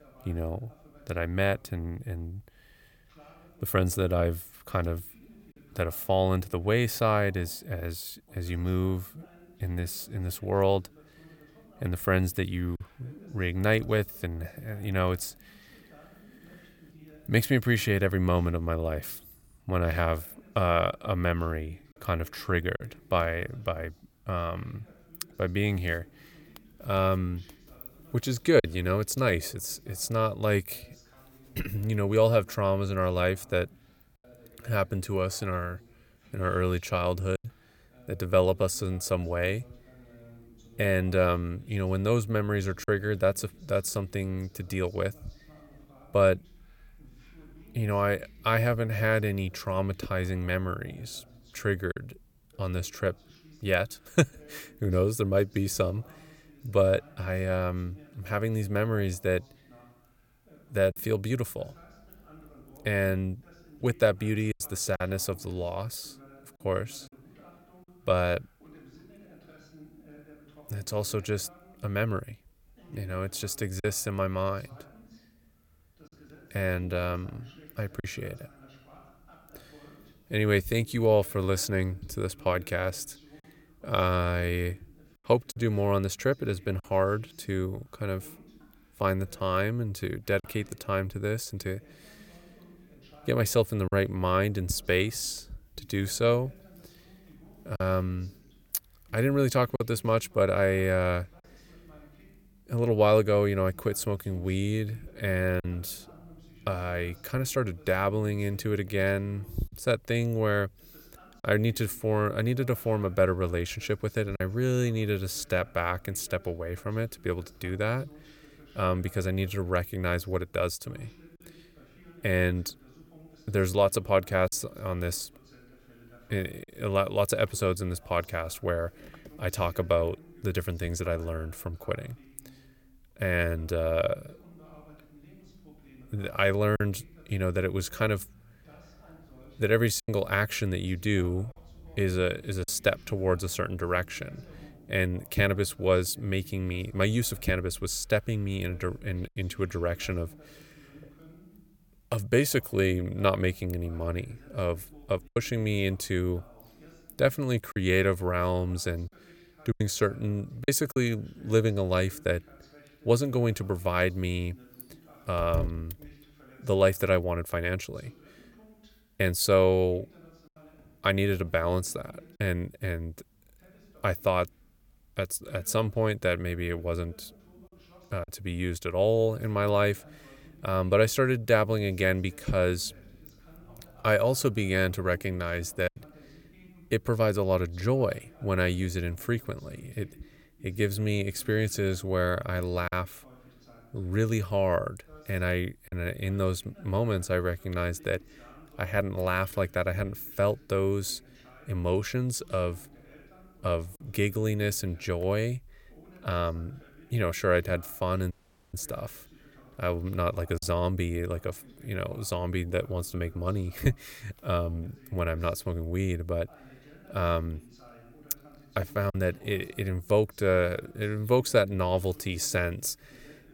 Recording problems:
voice in the background; faint; throughout; 25 dB below the speech
choppy; occasionally; 1% of the speech affected
audio cutting out; at 3:28

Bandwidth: 17 kHz